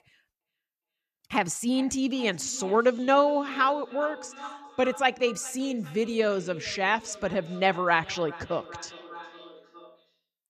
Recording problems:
echo of what is said; noticeable; throughout; 410 ms later, 15 dB below the speech

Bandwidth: 14.5 kHz